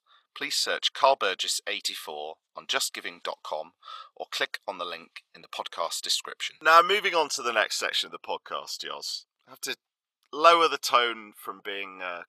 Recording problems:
thin; very; fading below 800 Hz

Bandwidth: 14 kHz